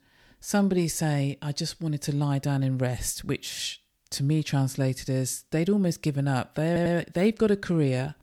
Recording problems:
audio stuttering; at 6.5 s

